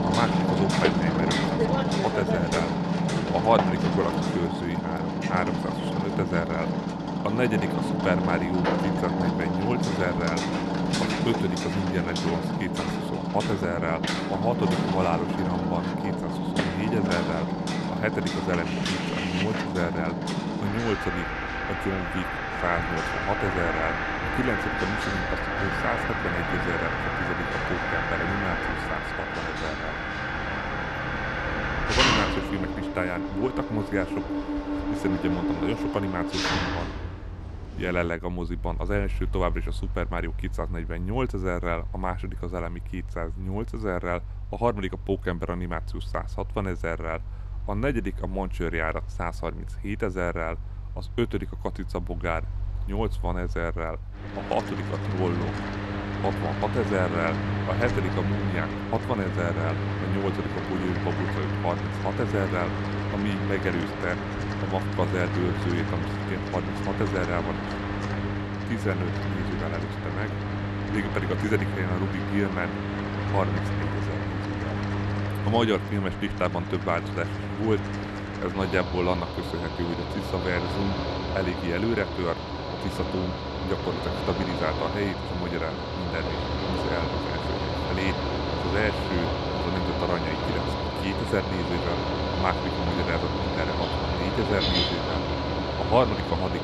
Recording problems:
machinery noise; very loud; throughout; 1 dB above the speech

